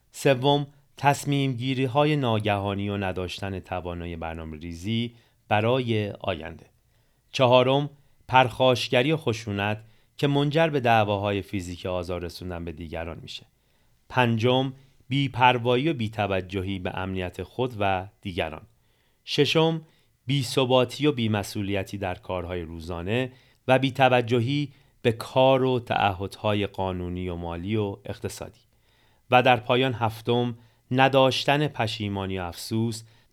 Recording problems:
none

